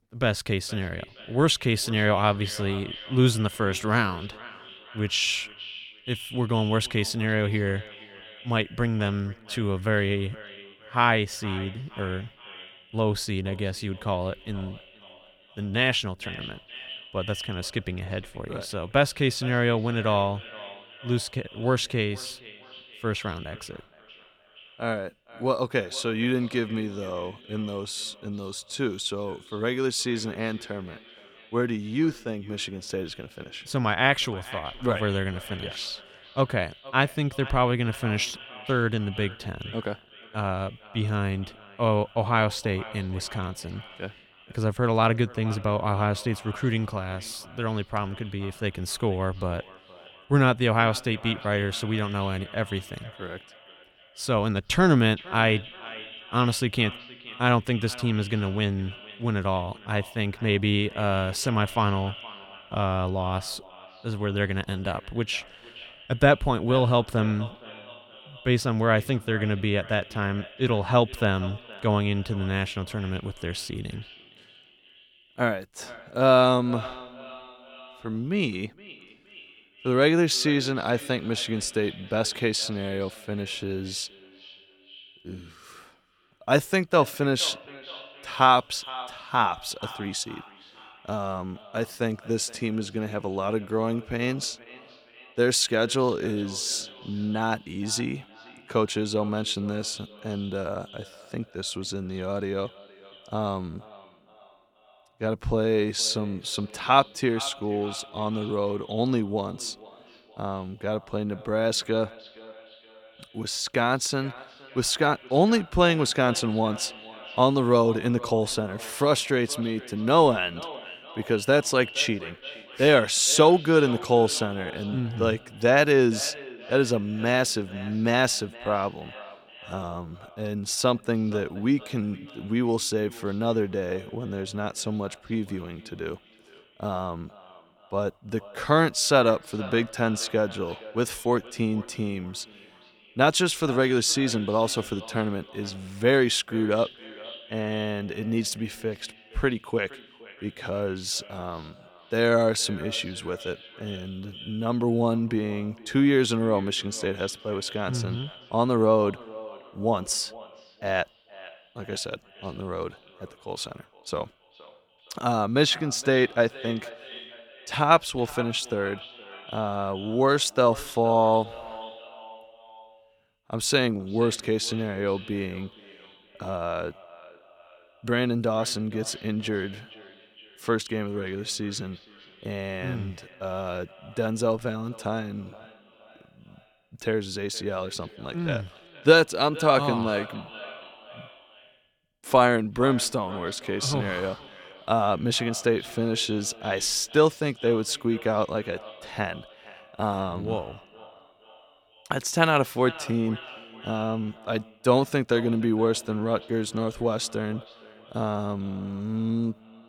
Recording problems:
echo of what is said; noticeable; throughout; 470 ms later, 20 dB below the speech

